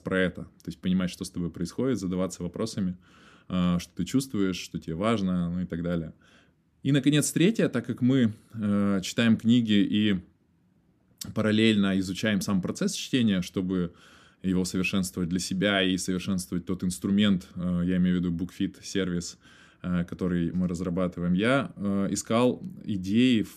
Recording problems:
none

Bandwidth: 14.5 kHz